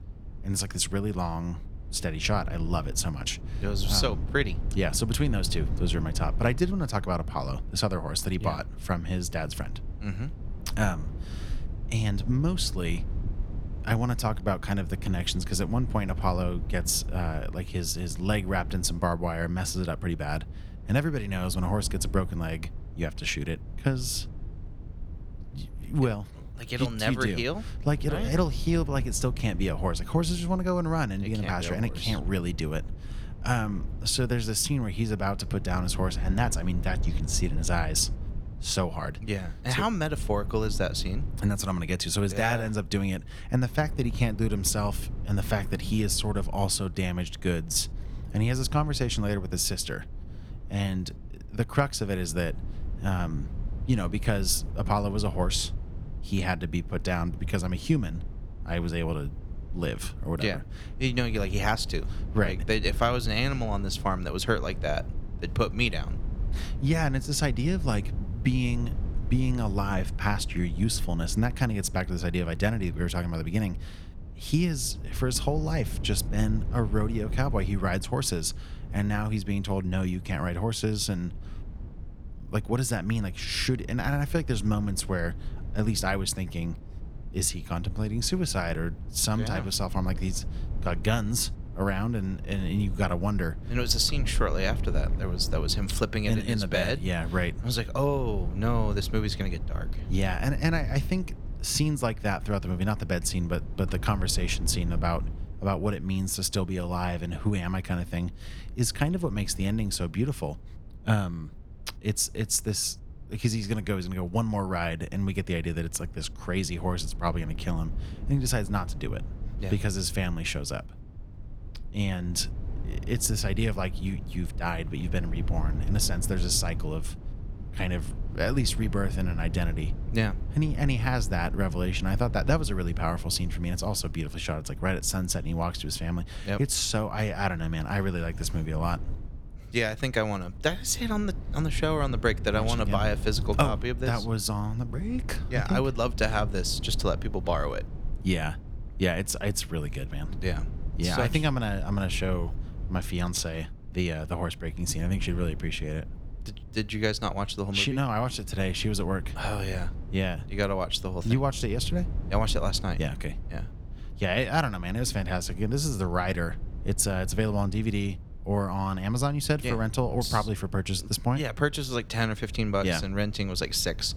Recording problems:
low rumble; noticeable; throughout; 20 dB below the speech

